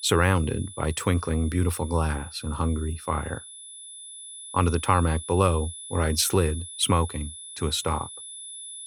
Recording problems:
high-pitched whine; noticeable; throughout; 10 kHz, 15 dB below the speech

